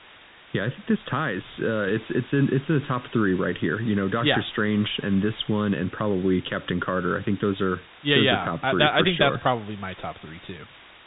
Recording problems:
high frequencies cut off; severe; nothing above 4 kHz
hiss; faint; throughout; 20 dB below the speech

